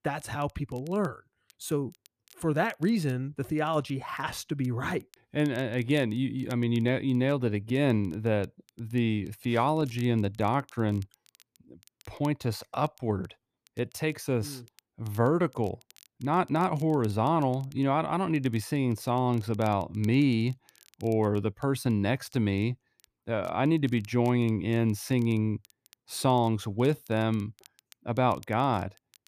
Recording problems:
crackle, like an old record; faint; 30 dB below the speech

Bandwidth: 14.5 kHz